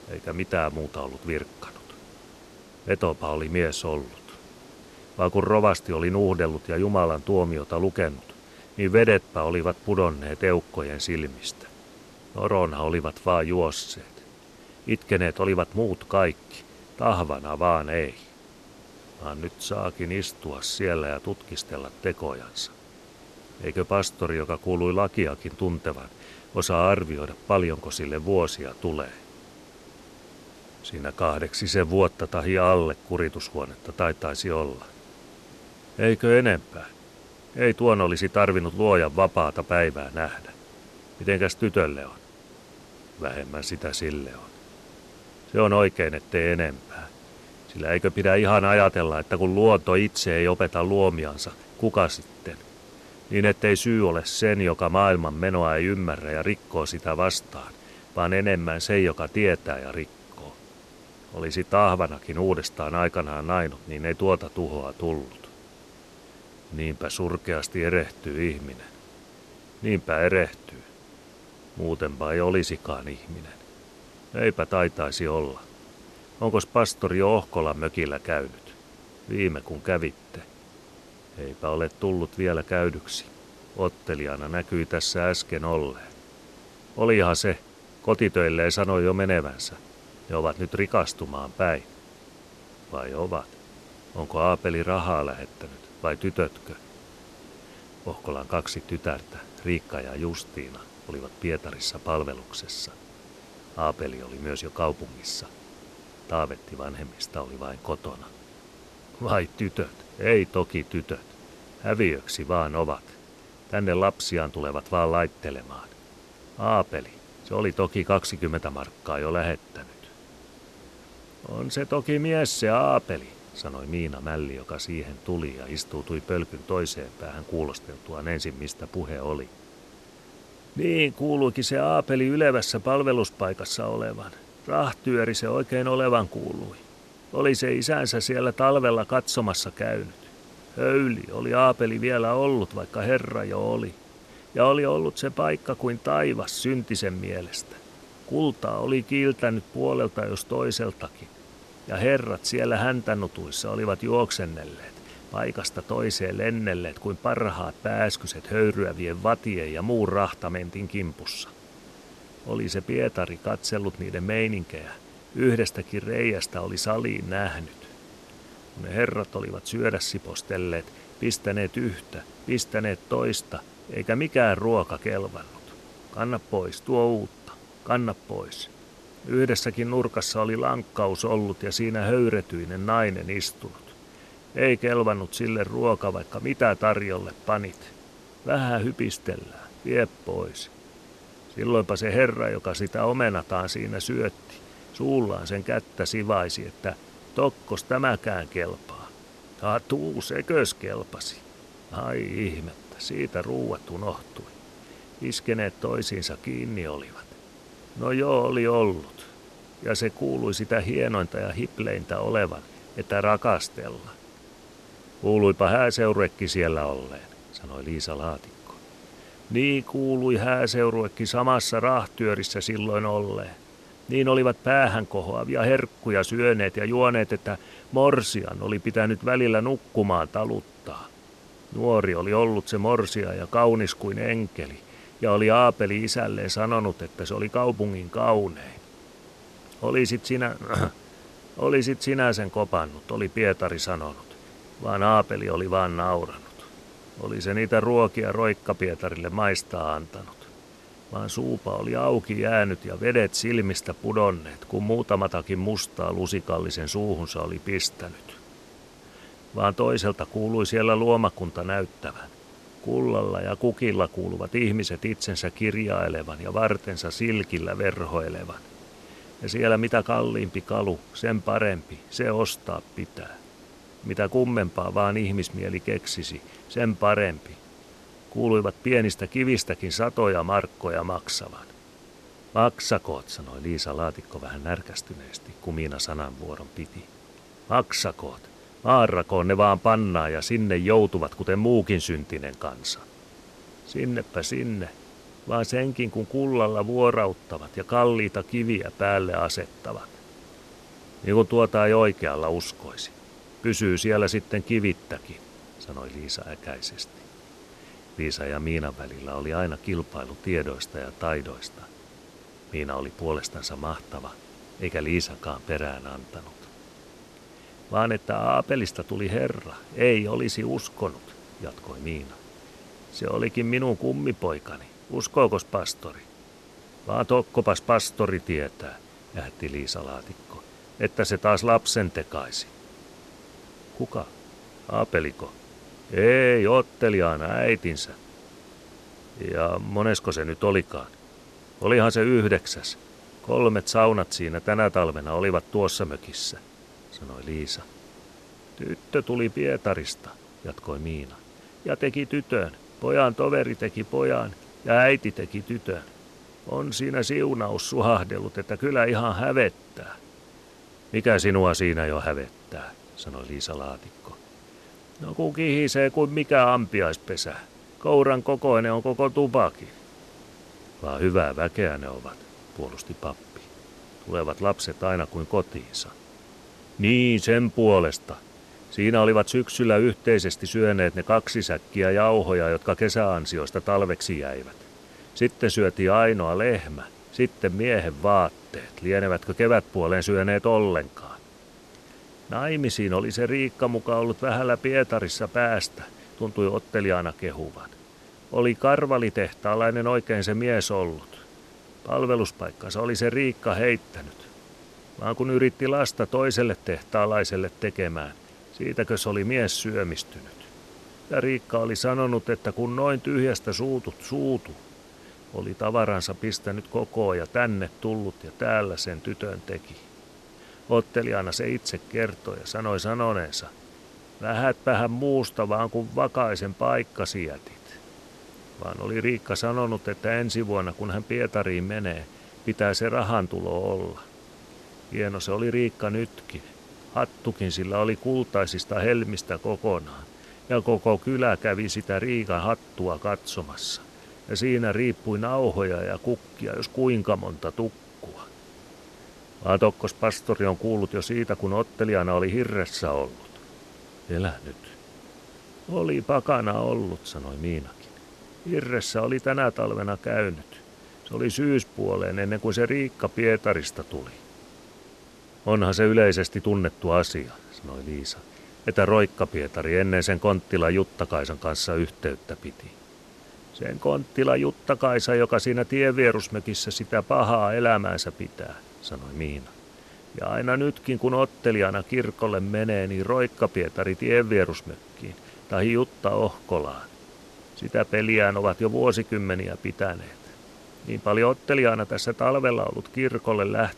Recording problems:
hiss; faint; throughout; 25 dB below the speech

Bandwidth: 13.5 kHz